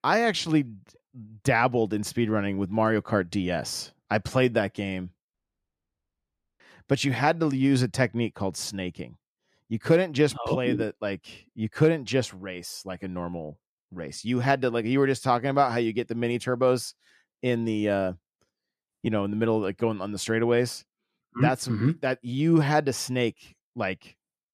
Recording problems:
audio cutting out; at 5.5 s for 1.5 s

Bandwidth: 14 kHz